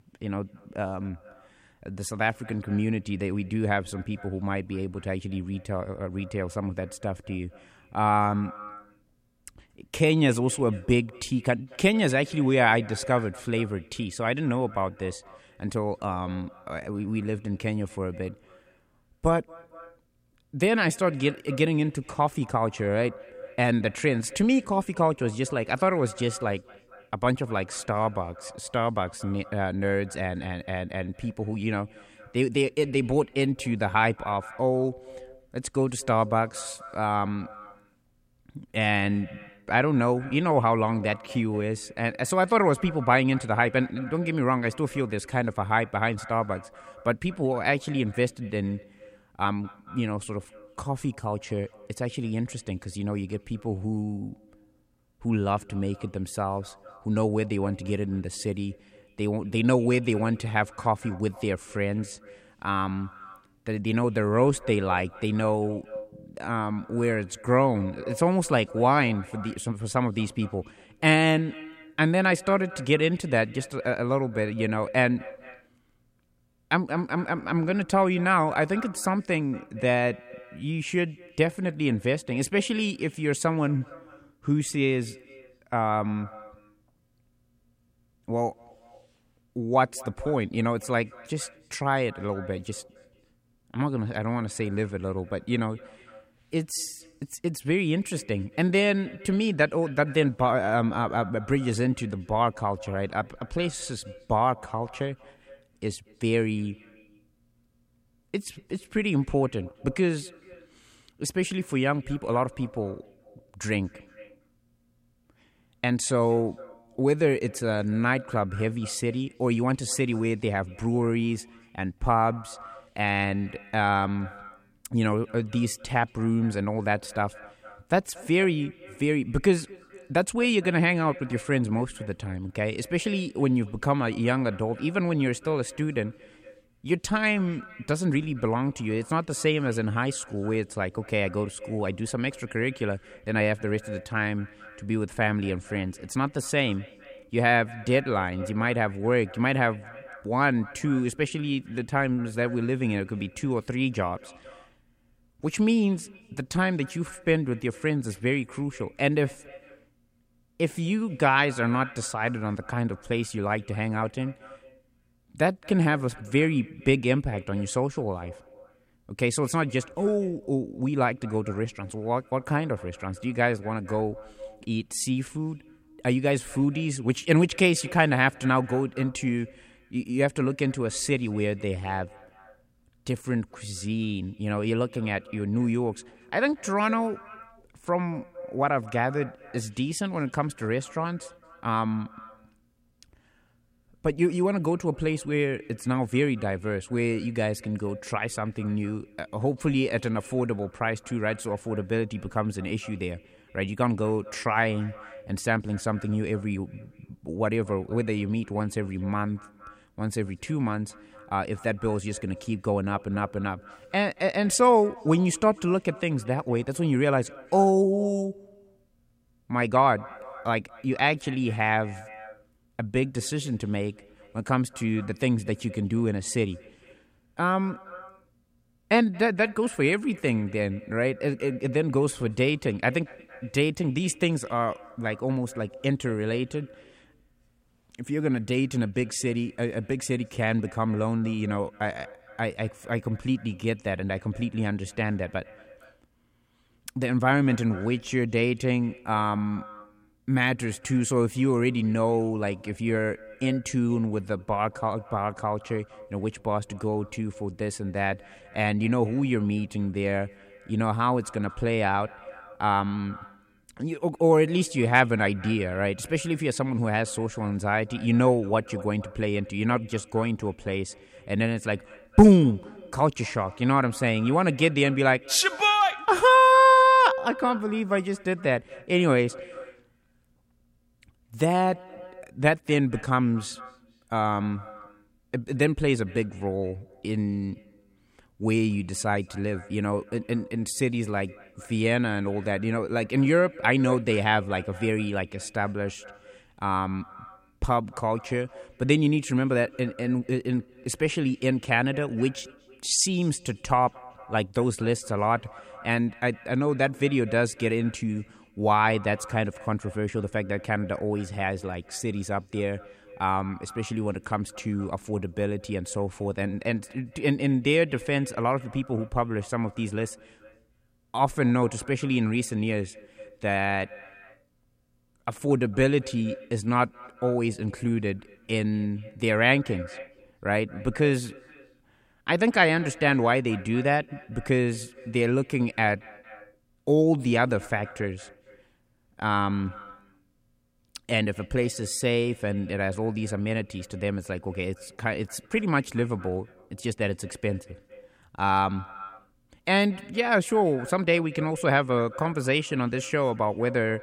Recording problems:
echo of what is said; faint; throughout; 230 ms later, 20 dB below the speech

